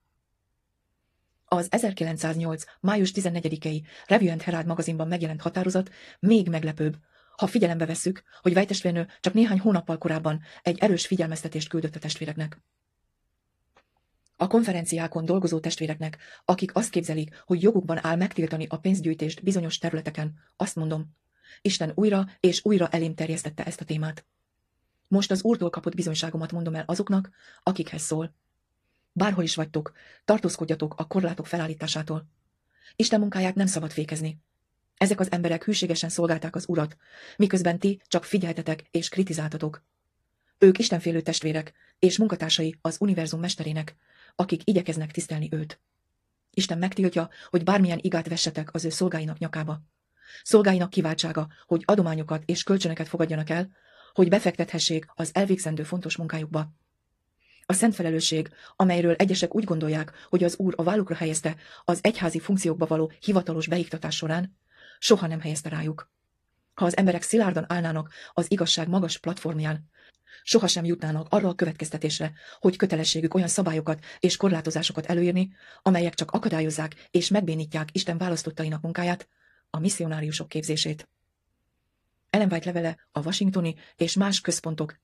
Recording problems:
wrong speed, natural pitch; too fast; 1.5 times normal speed
garbled, watery; slightly

